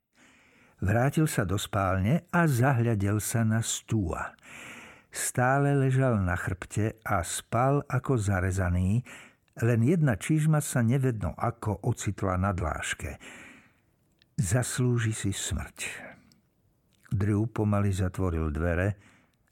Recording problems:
none

